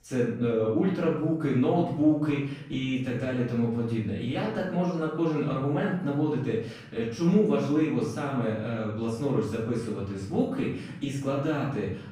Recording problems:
off-mic speech; far
room echo; noticeable; dies away in 0.6 s

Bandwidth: 15 kHz